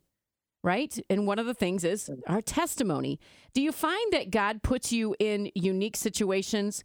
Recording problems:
none

